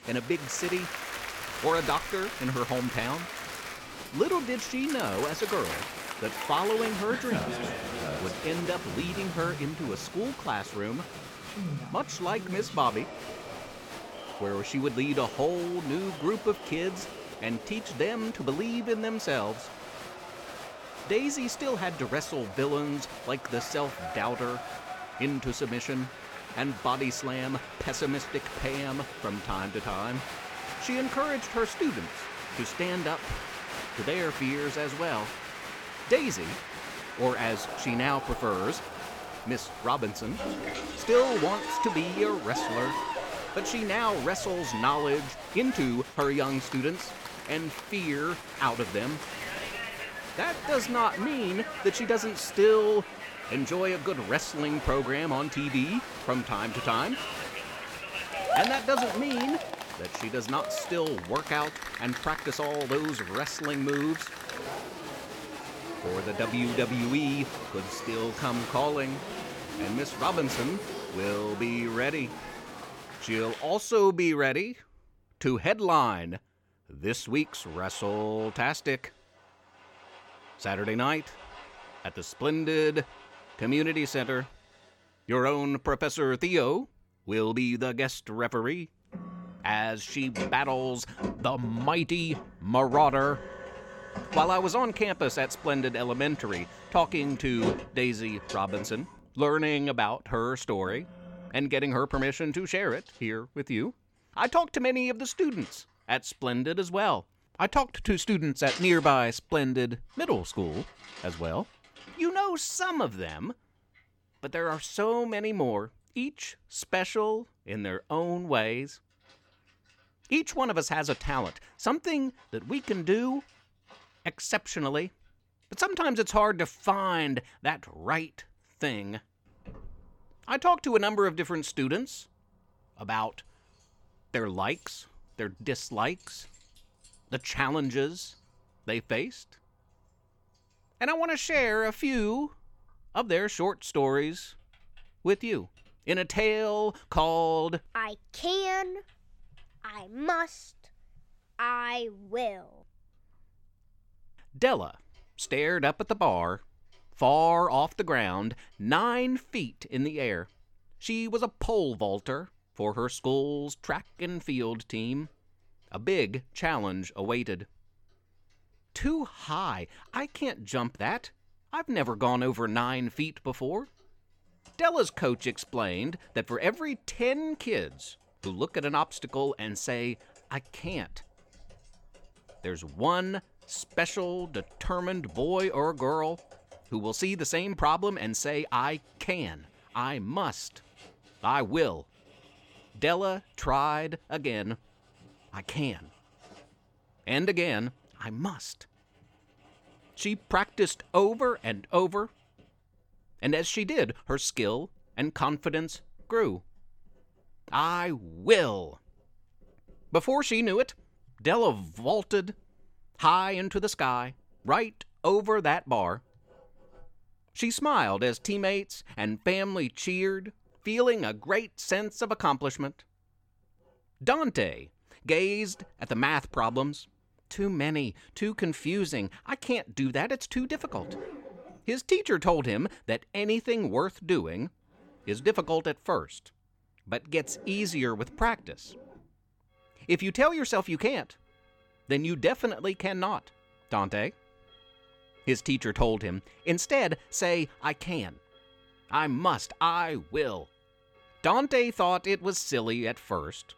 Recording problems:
crowd noise; loud; until 1:14; 8 dB below the speech
household noises; noticeable; throughout; 15 dB below the speech

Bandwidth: 17.5 kHz